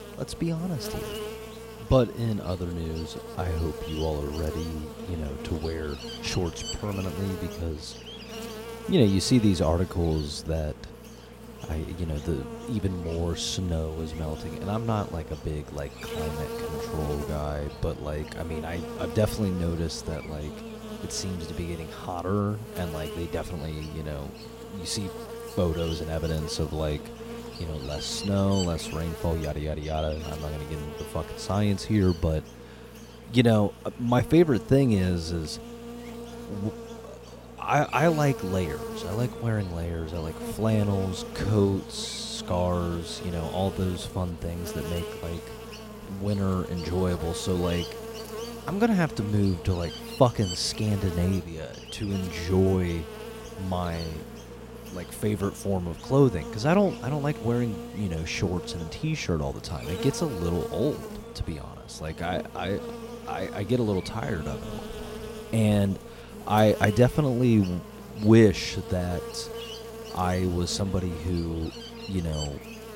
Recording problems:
electrical hum; loud; throughout; 60 Hz, 9 dB below the speech

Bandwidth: 16 kHz